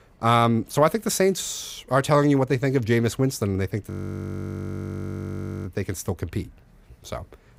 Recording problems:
audio freezing; at 4 s for 2 s

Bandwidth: 15.5 kHz